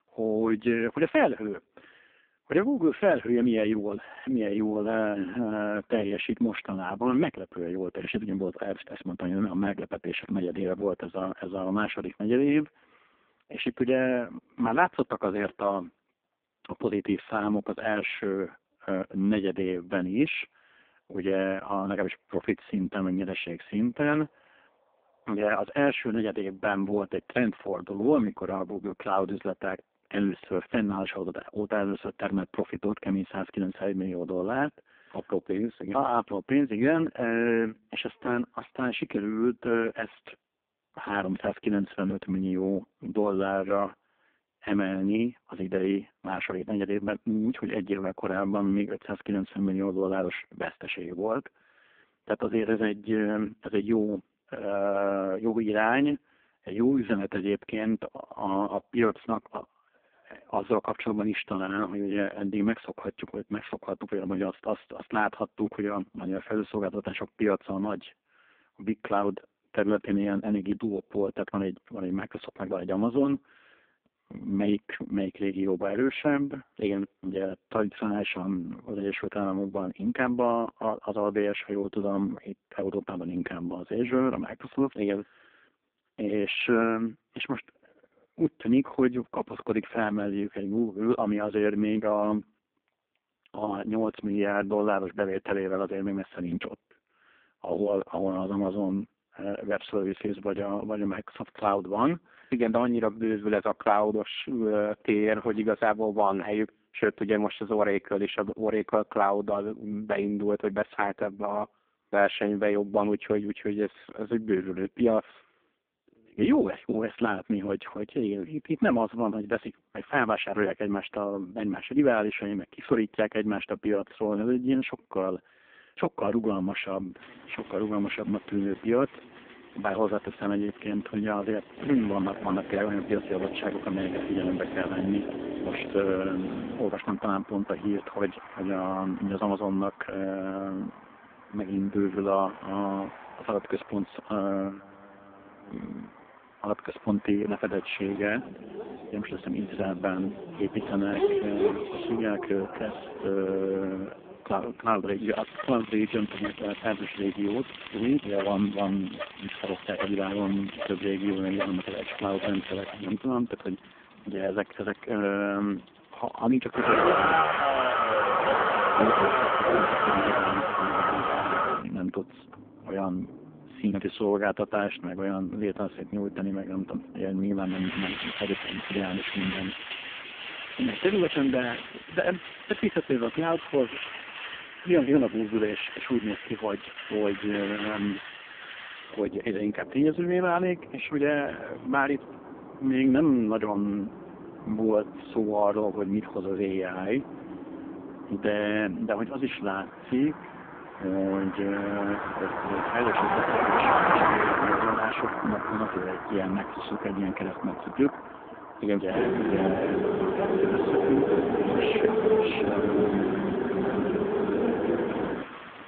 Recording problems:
phone-call audio; poor line
traffic noise; loud; from 2:07 on; 1 dB below the speech

